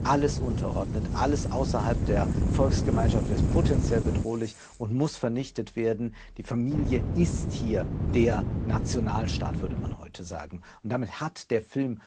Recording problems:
garbled, watery; slightly; nothing above 8 kHz
wind noise on the microphone; heavy; until 4 s and from 6.5 to 10 s; 5 dB below the speech
traffic noise; faint; throughout; 20 dB below the speech

